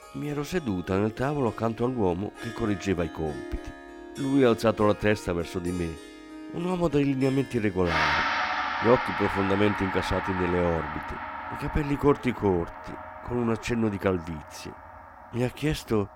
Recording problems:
background music; loud; throughout; 6 dB below the speech

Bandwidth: 16.5 kHz